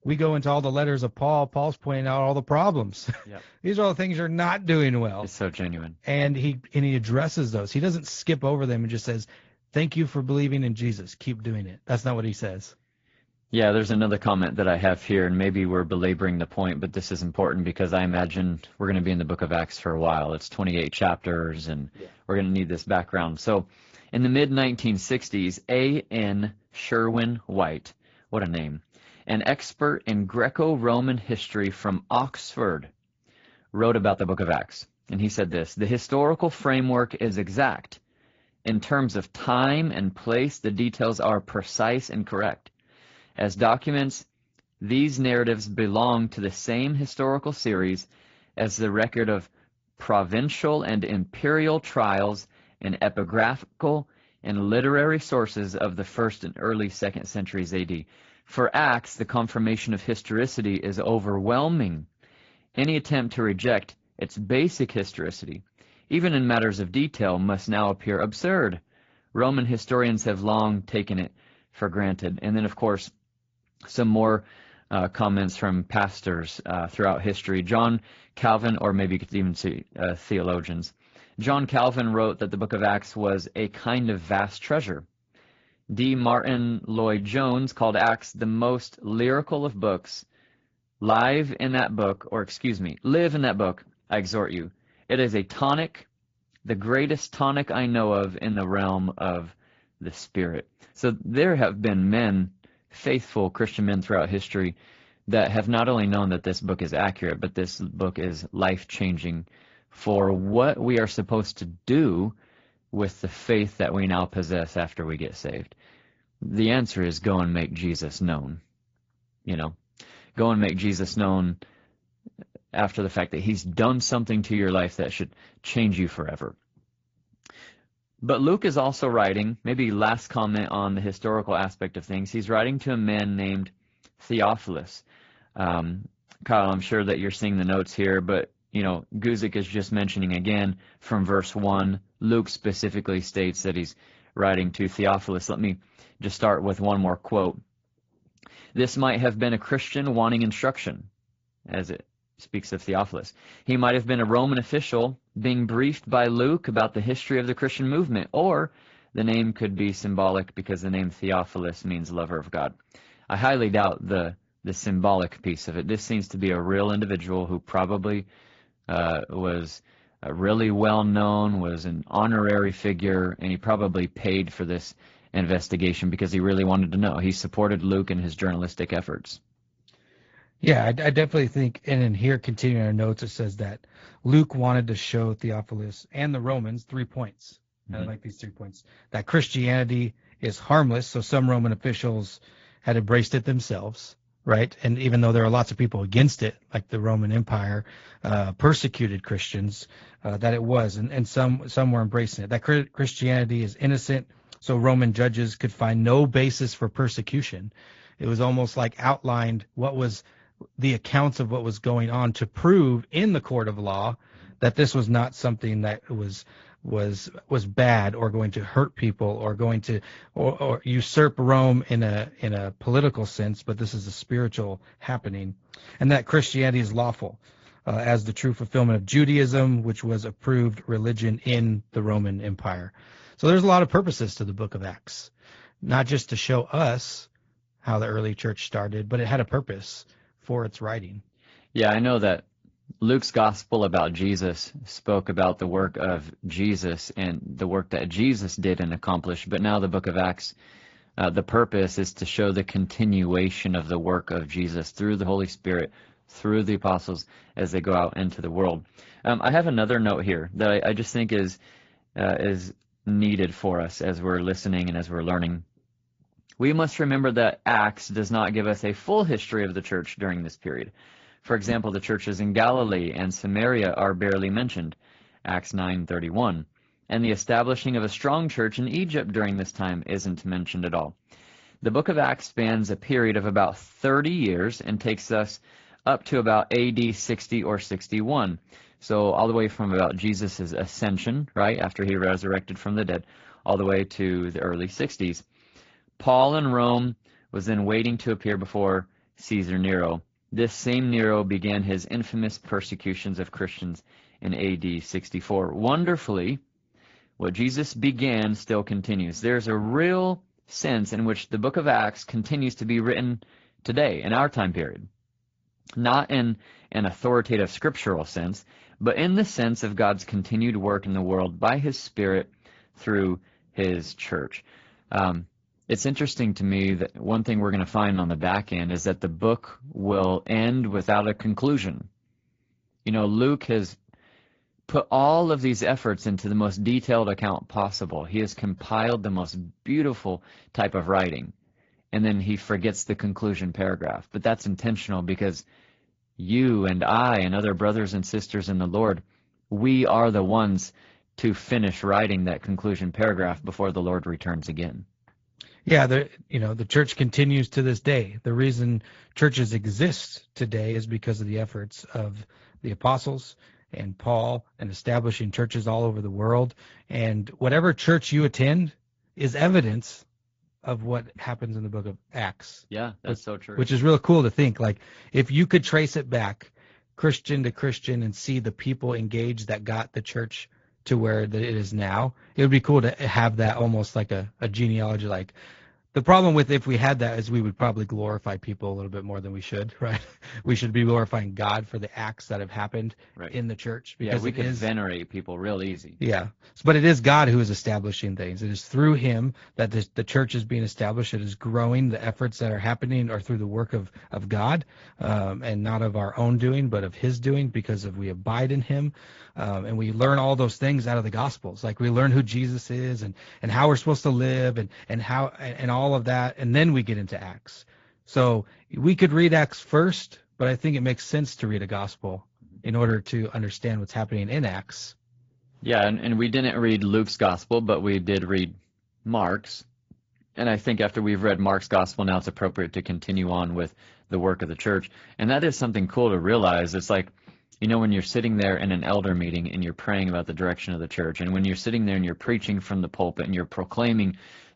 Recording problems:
high frequencies cut off; noticeable; nothing above 7.5 kHz
garbled, watery; slightly

